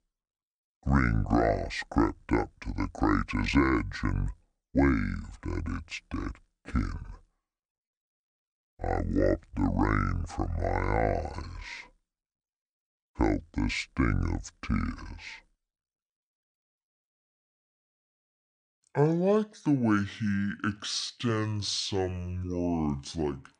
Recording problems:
wrong speed and pitch; too slow and too low; 0.6 times normal speed

